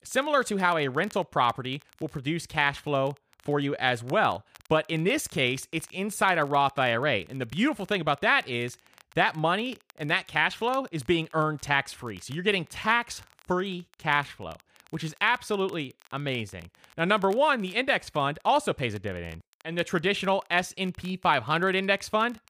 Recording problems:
crackle, like an old record; faint; 30 dB below the speech

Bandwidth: 15 kHz